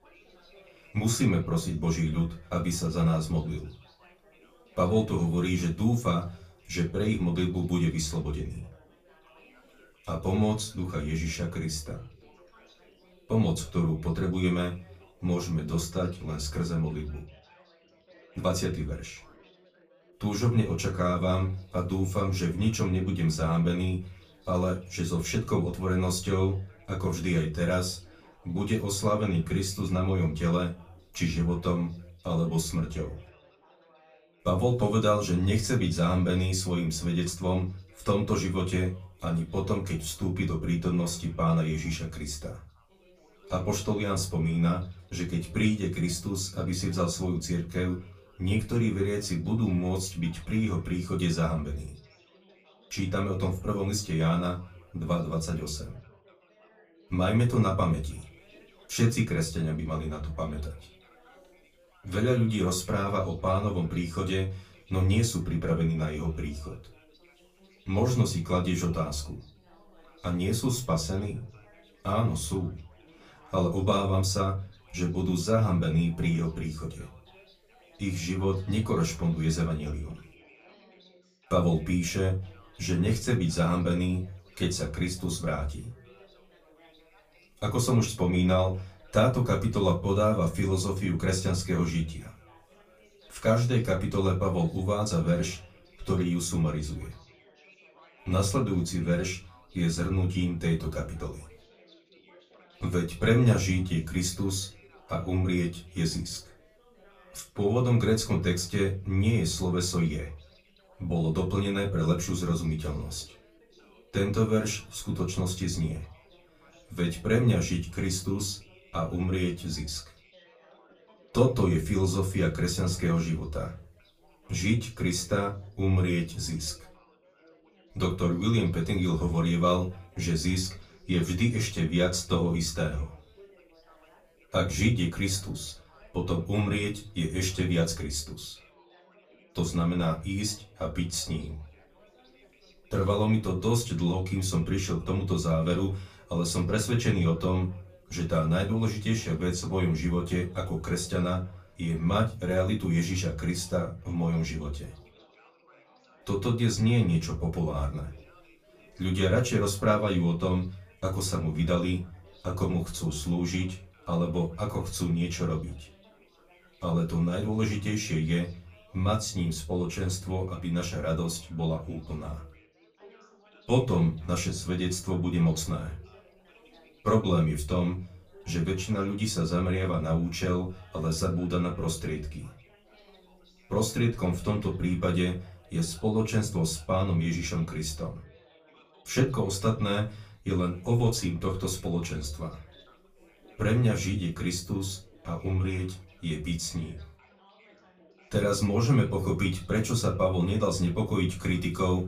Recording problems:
off-mic speech; far
room echo; very slight; dies away in 0.3 s
background chatter; faint; throughout; 4 voices, 30 dB below the speech

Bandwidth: 15 kHz